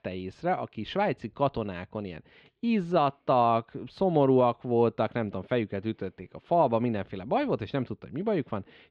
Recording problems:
muffled; slightly; fading above 3 kHz

